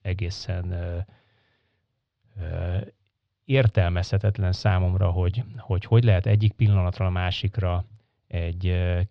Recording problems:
muffled; slightly; fading above 4 kHz

